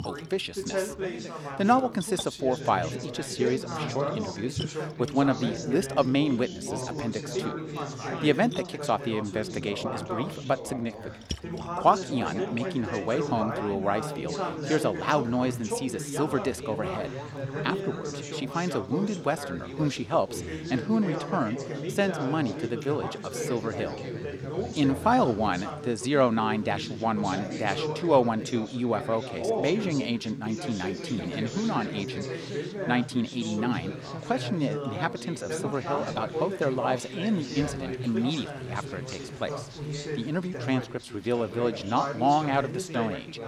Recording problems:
background chatter; loud; throughout; 3 voices, 6 dB below the speech
rain or running water; faint; throughout; 20 dB below the speech

